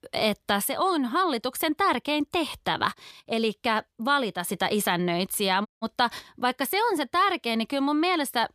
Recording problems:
audio cutting out; at 5.5 s

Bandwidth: 14.5 kHz